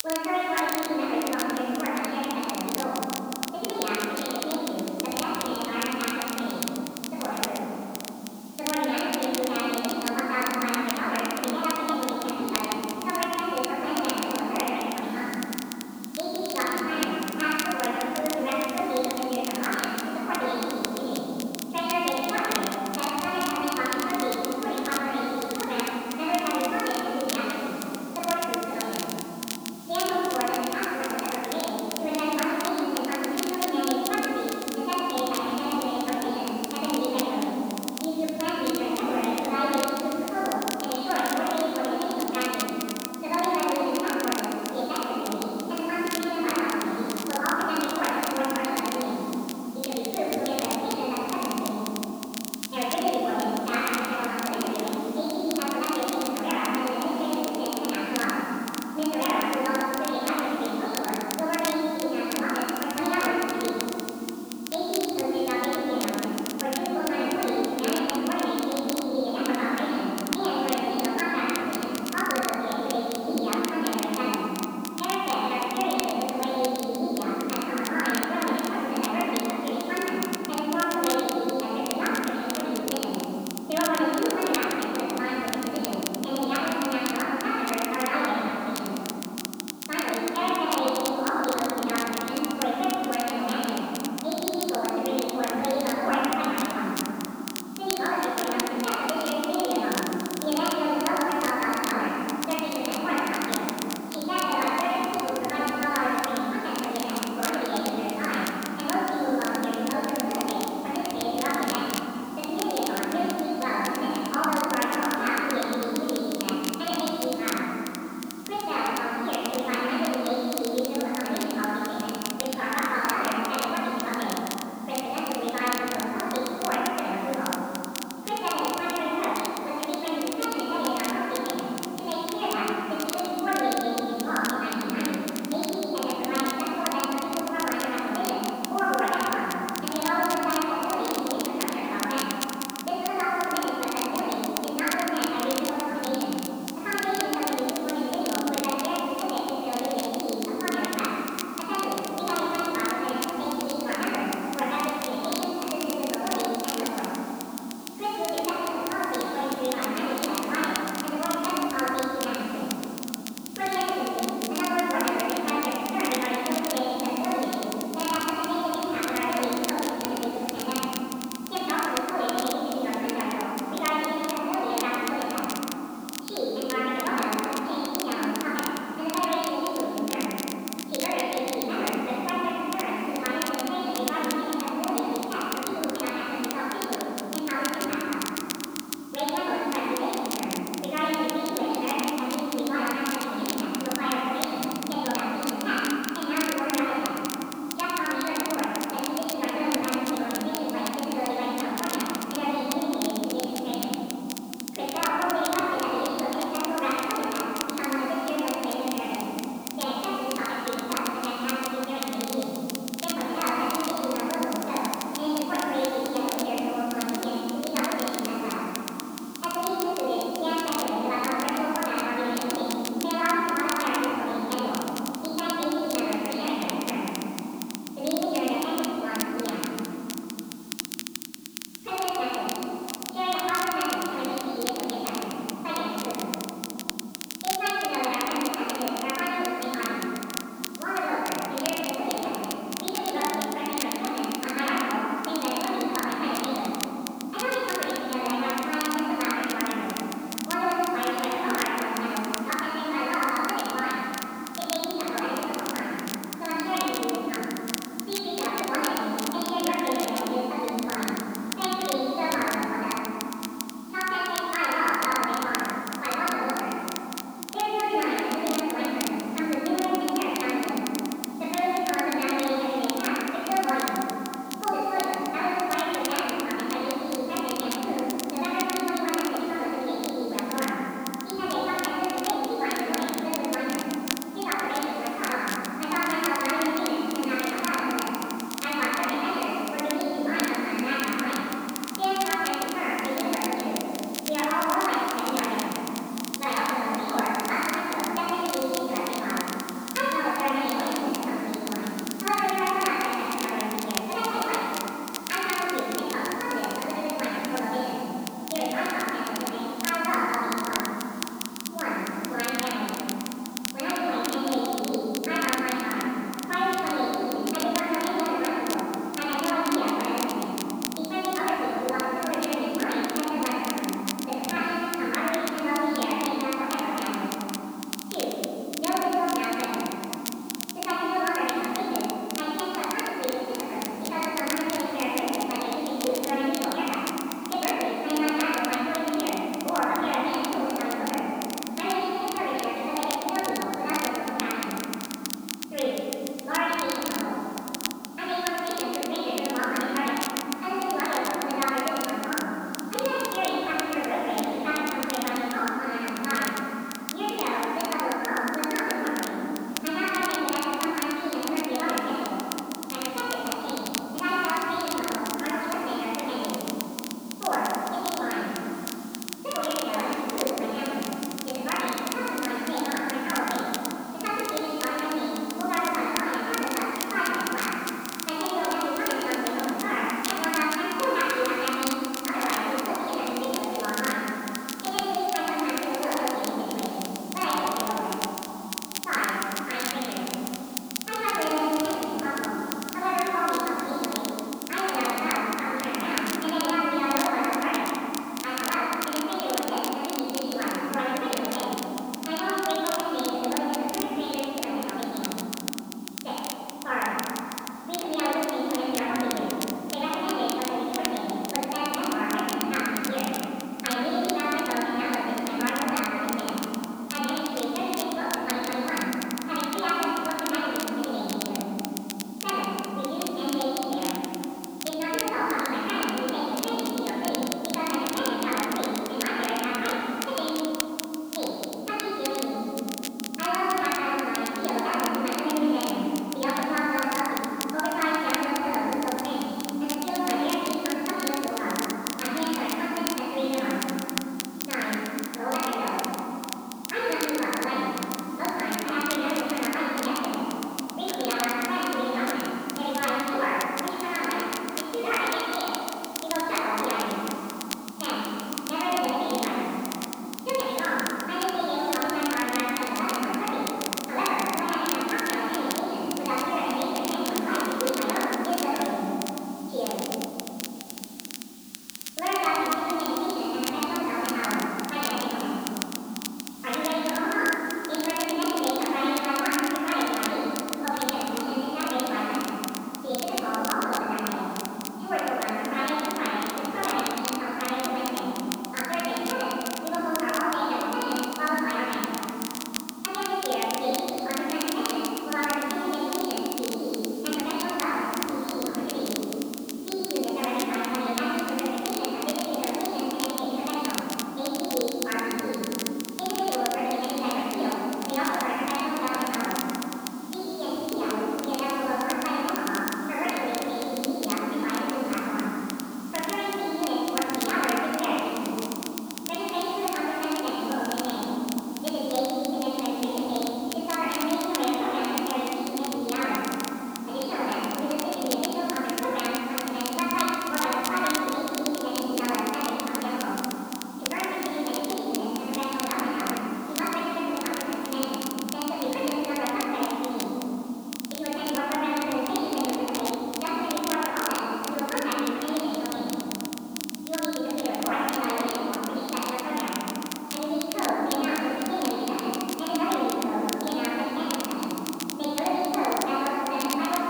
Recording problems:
room echo; strong; dies away in 3 s
off-mic speech; far
high frequencies cut off; severe; nothing above 5 kHz
wrong speed and pitch; too fast and too high; 1.5 times normal speed
hiss; very faint; throughout; 20 dB below the speech
crackle, like an old record; very faint; 8 dB below the speech

